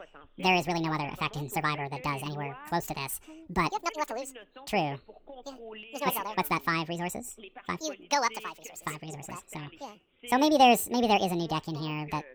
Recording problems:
wrong speed and pitch; too fast and too high; 1.7 times normal speed
voice in the background; noticeable; throughout; 20 dB below the speech

